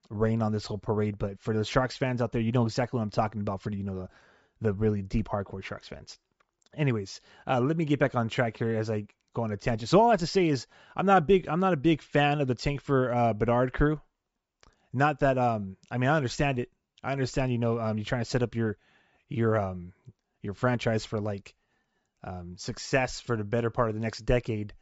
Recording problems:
high frequencies cut off; noticeable; nothing above 8 kHz

